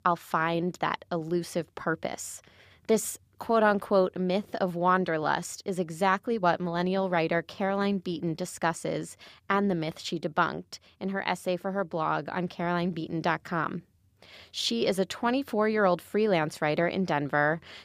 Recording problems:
none

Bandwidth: 15 kHz